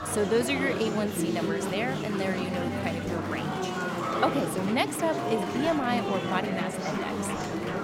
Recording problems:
murmuring crowd; loud; throughout; 1 dB below the speech

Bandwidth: 16.5 kHz